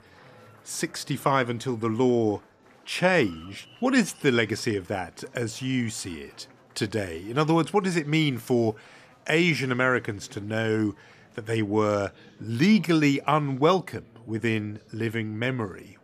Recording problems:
murmuring crowd; faint; throughout; 25 dB below the speech

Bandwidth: 14.5 kHz